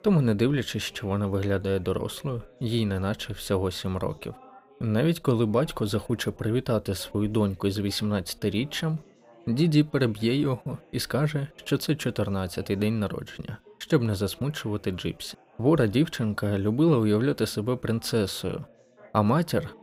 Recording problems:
background chatter; faint; throughout; 4 voices, 25 dB below the speech

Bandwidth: 15.5 kHz